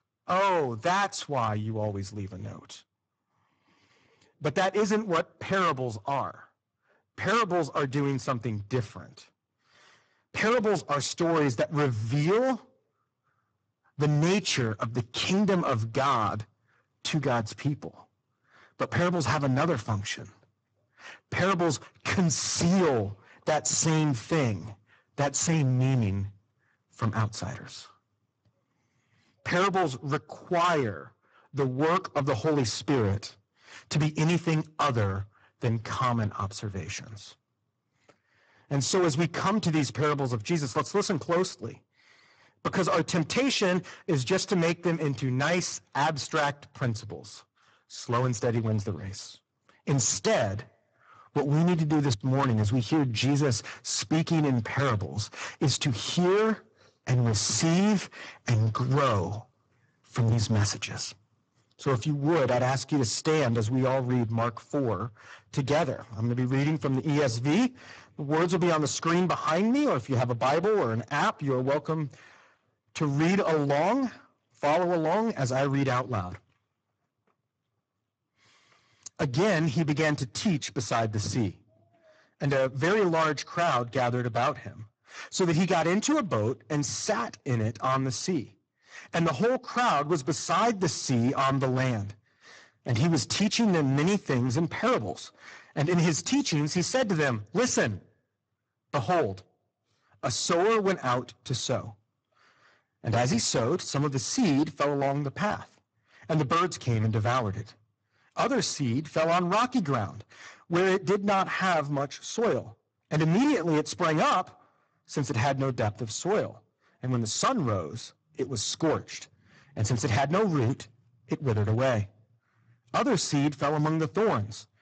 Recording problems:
distortion; heavy; 13% of the sound clipped
garbled, watery; badly; nothing above 7.5 kHz

